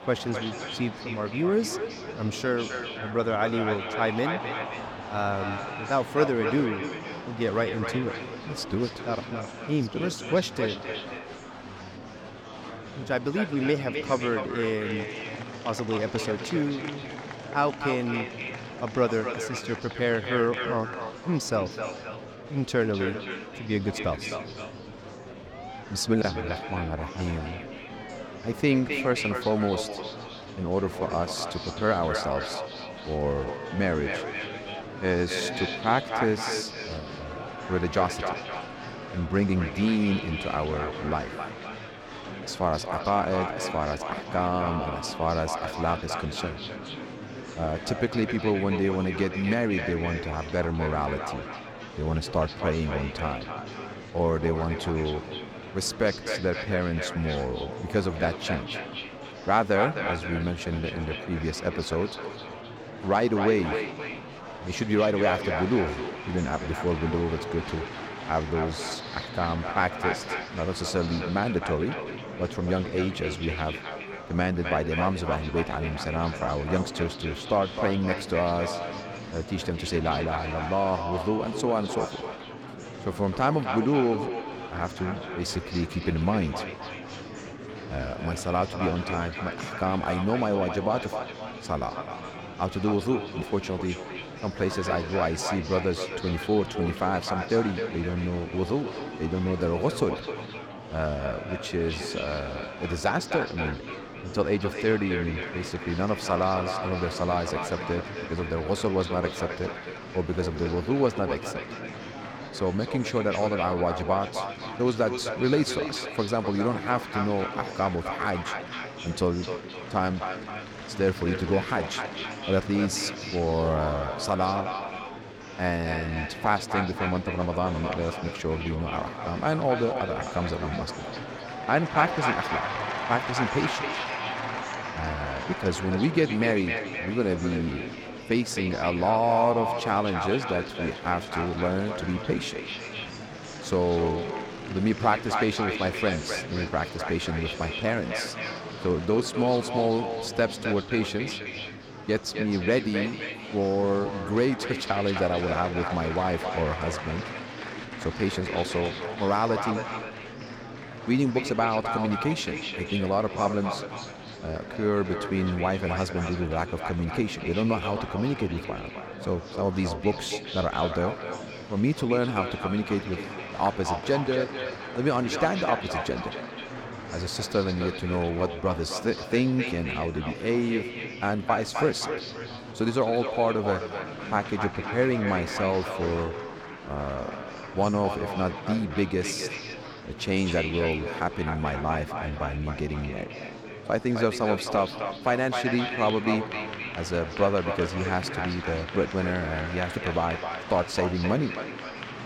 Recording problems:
echo of what is said; strong; throughout; 260 ms later, 7 dB below the speech
murmuring crowd; noticeable; throughout; 10 dB below the speech

